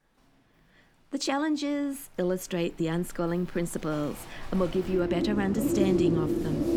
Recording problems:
animal sounds; very loud; throughout; 1 dB above the speech

